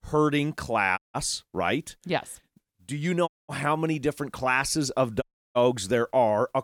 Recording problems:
audio cutting out; at 1 s, at 3.5 s and at 5 s

